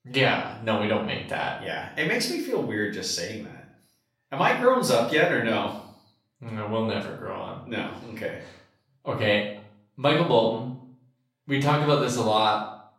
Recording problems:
off-mic speech; far
room echo; noticeable; dies away in 0.5 s

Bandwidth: 16 kHz